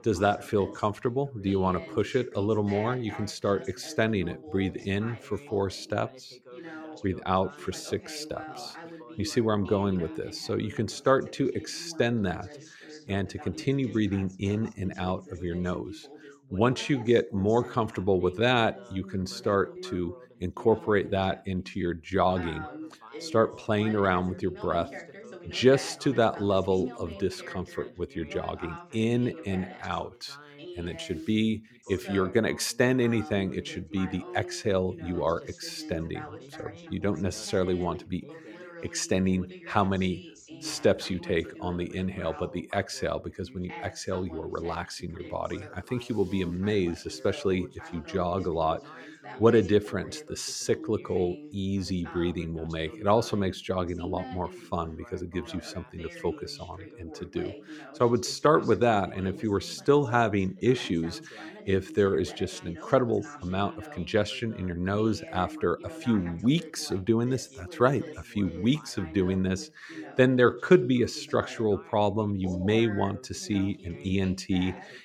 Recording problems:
background chatter; noticeable; throughout; 2 voices, 15 dB below the speech

